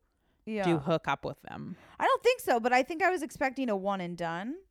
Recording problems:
none

